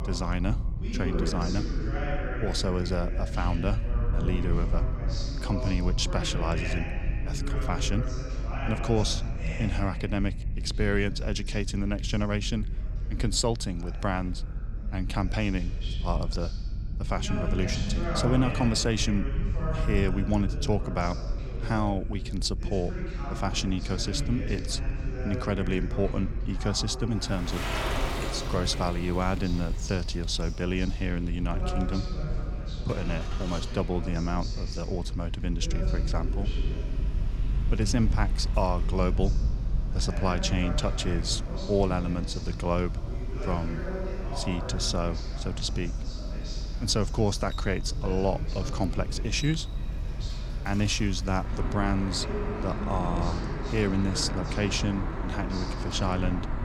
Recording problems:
voice in the background; loud; throughout; 9 dB below the speech
traffic noise; noticeable; from 28 s on; 10 dB below the speech
low rumble; noticeable; throughout; 20 dB below the speech

